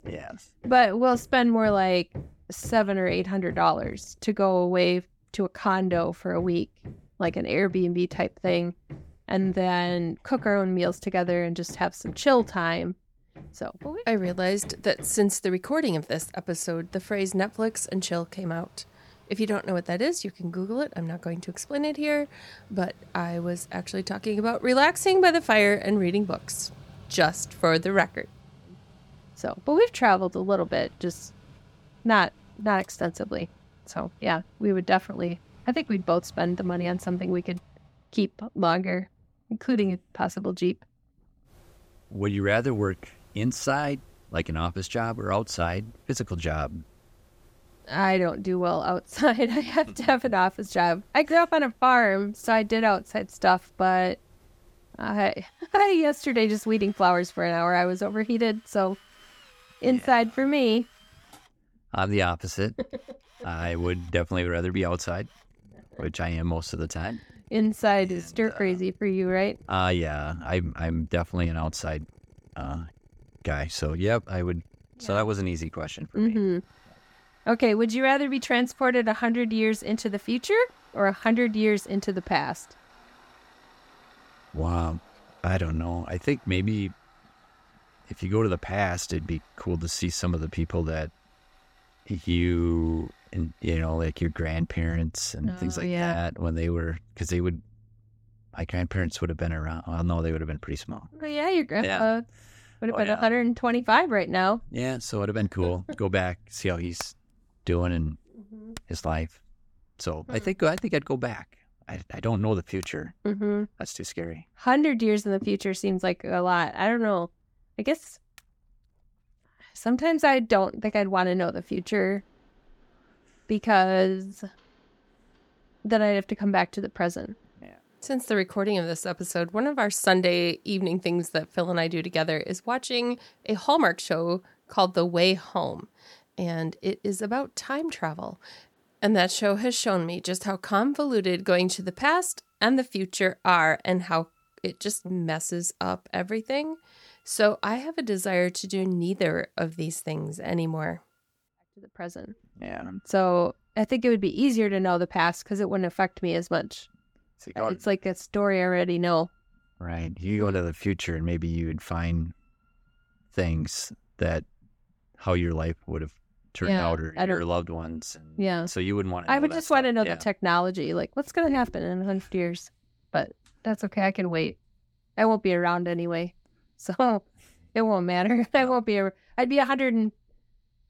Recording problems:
machinery noise; faint; throughout; 25 dB below the speech

